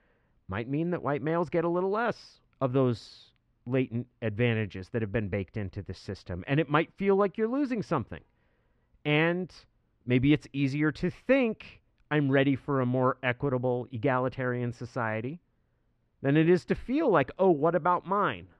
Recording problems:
muffled; slightly; fading above 2.5 kHz

